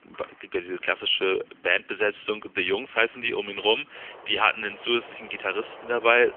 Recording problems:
phone-call audio; nothing above 3.5 kHz
traffic noise; faint; throughout; 20 dB below the speech

